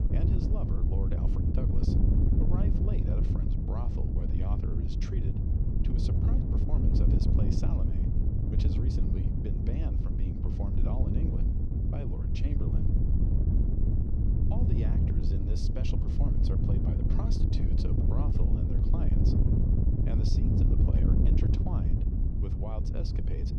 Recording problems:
wind noise on the microphone; heavy; 5 dB above the speech

